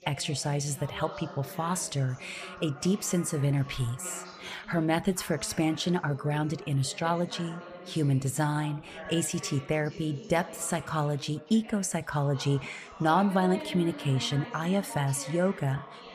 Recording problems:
background chatter; noticeable; throughout; 3 voices, 15 dB below the speech

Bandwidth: 15 kHz